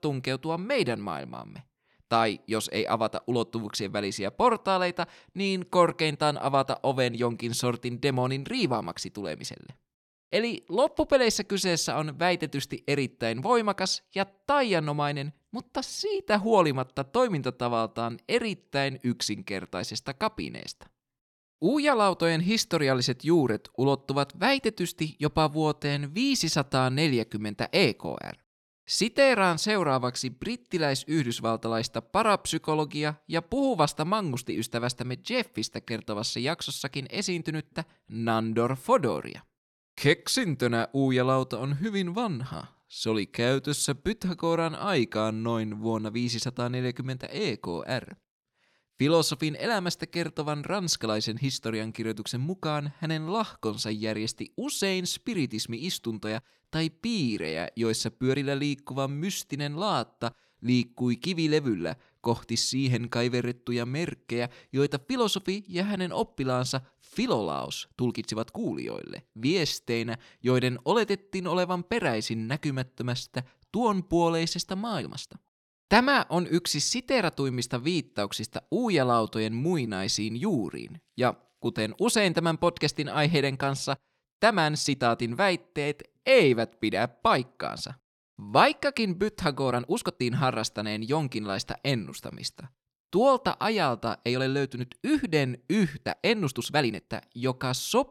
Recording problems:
uneven, jittery; strongly; from 16 s to 1:37

